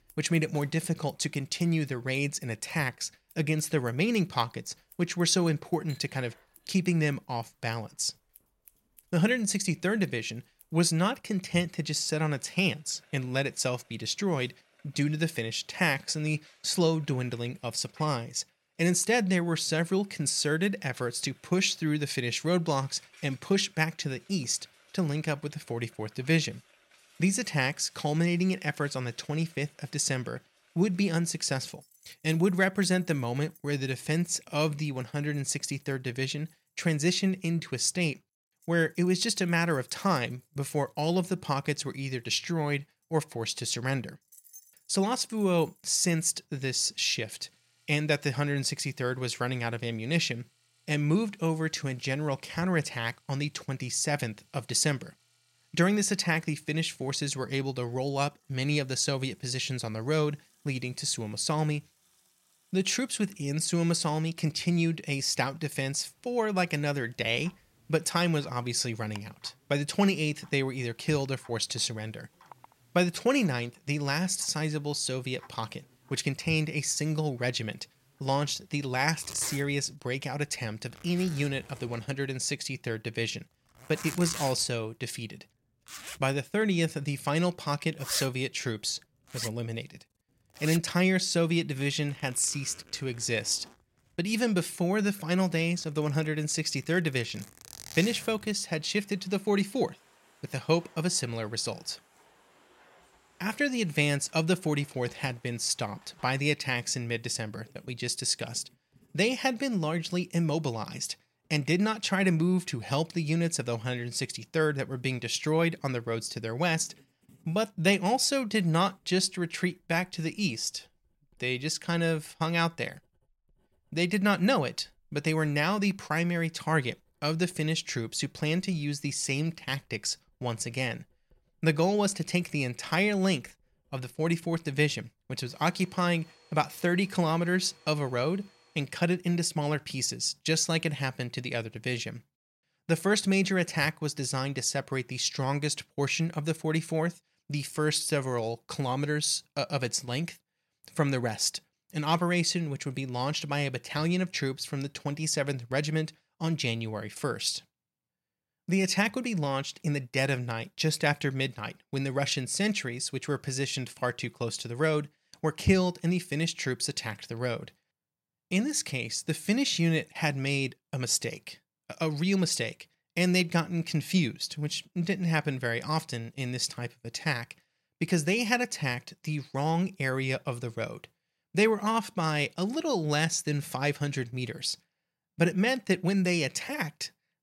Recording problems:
household noises; noticeable; until 2:19; 20 dB below the speech

